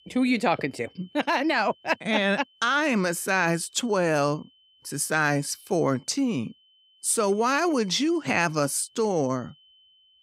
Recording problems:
high-pitched whine; faint; throughout; 3 kHz, 30 dB below the speech

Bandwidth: 15.5 kHz